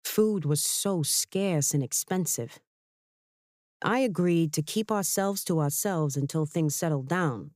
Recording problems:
none

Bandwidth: 15 kHz